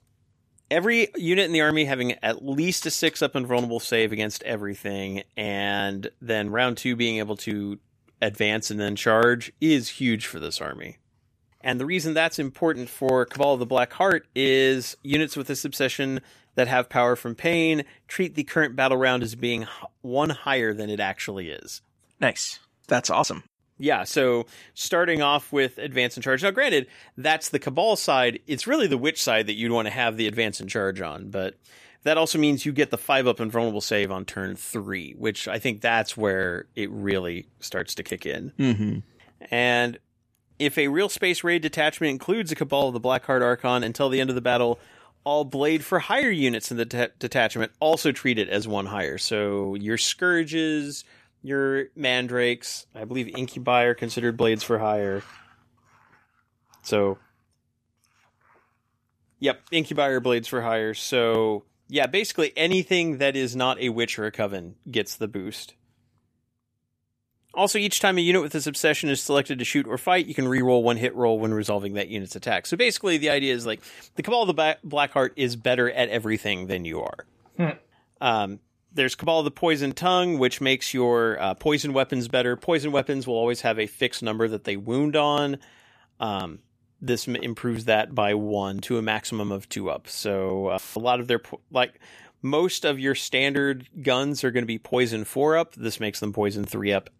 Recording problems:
audio cutting out; filled with static; at 1:31

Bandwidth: 14.5 kHz